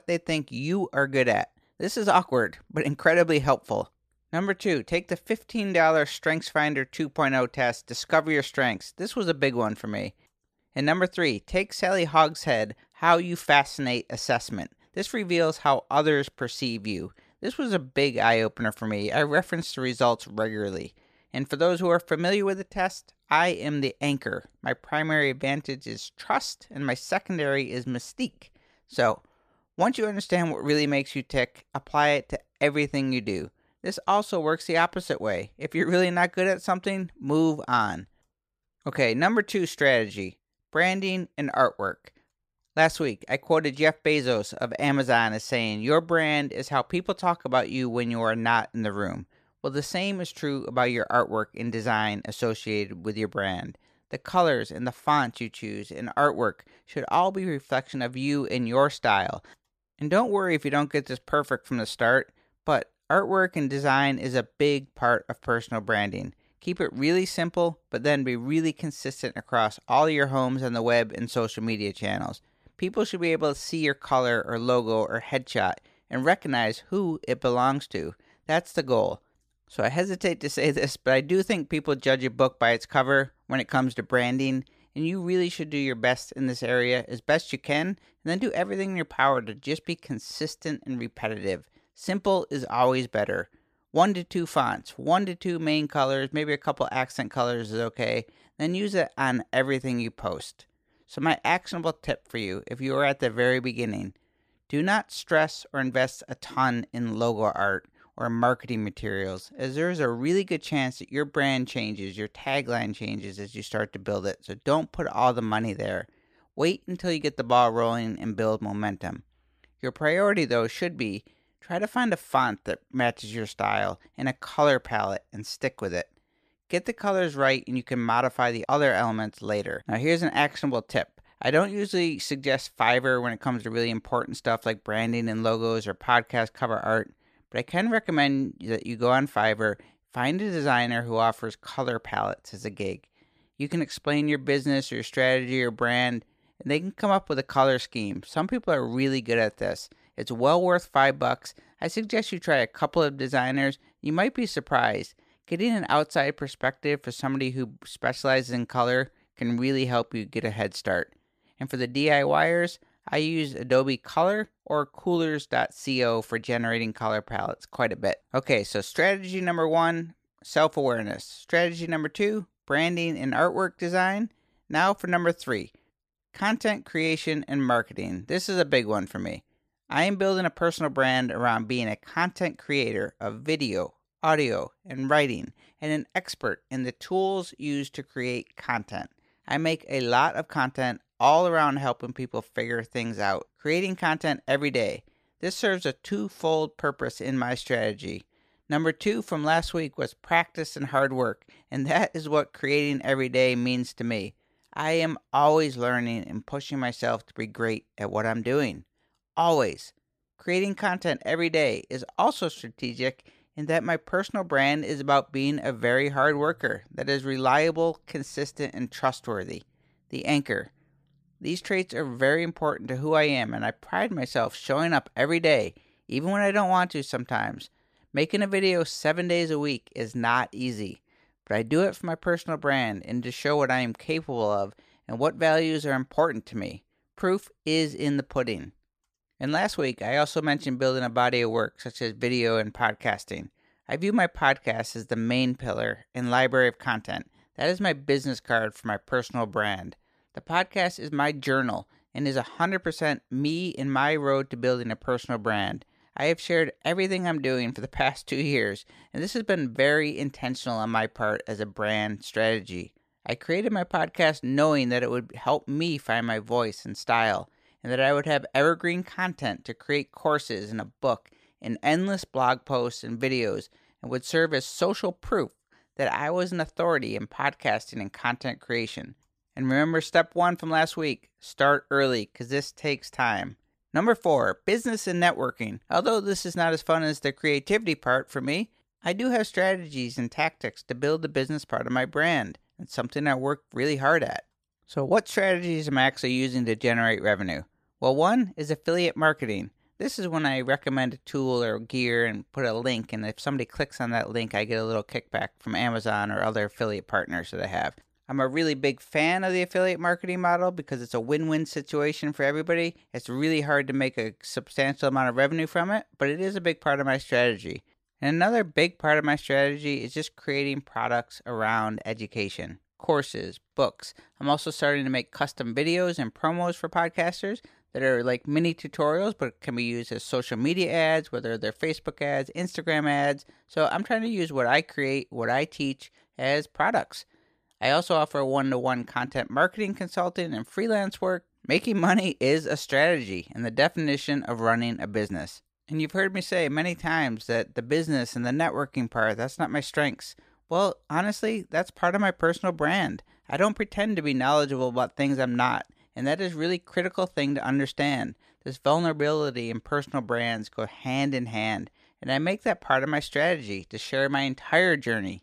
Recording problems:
none

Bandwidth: 14.5 kHz